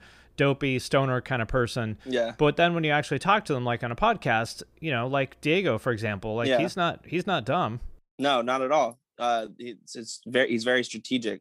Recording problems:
none

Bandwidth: 15.5 kHz